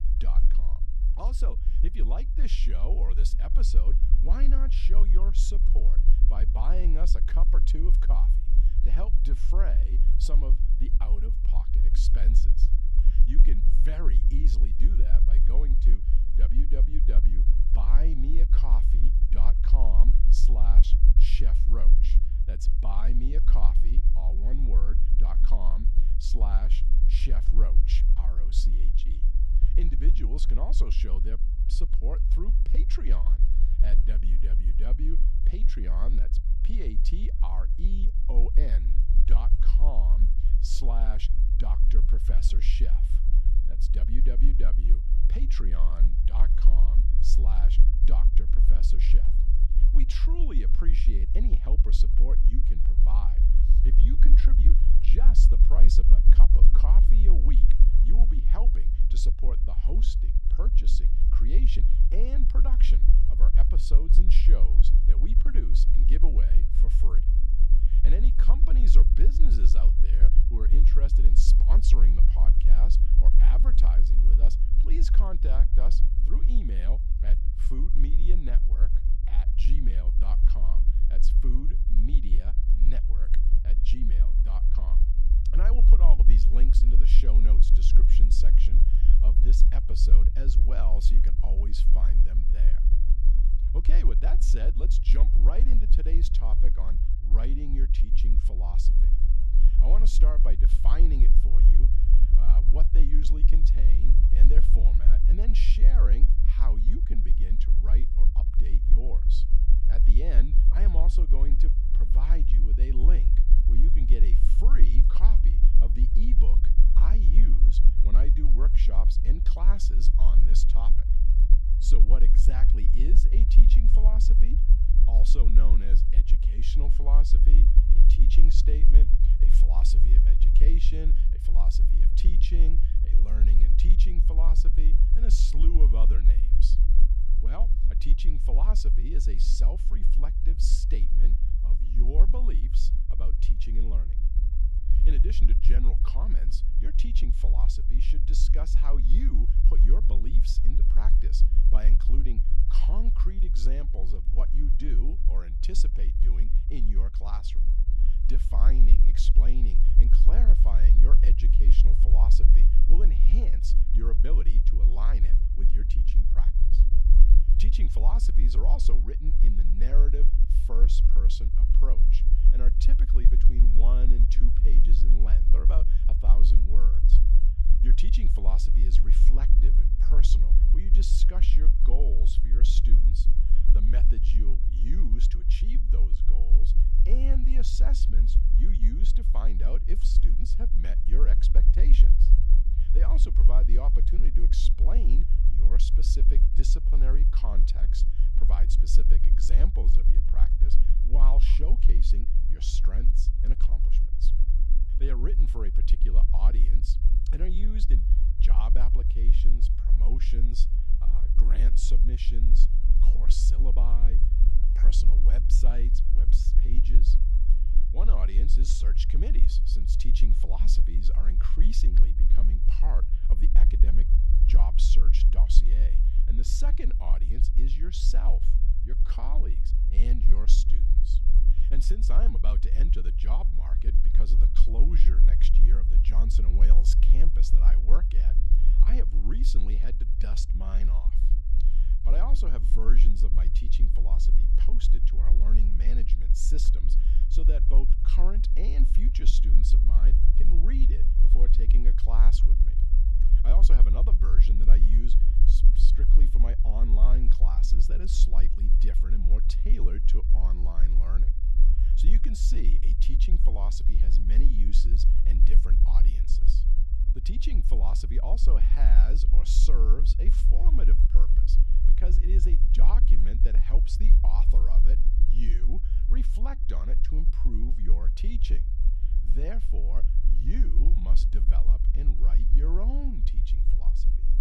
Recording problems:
low rumble; loud; throughout; 5 dB below the speech

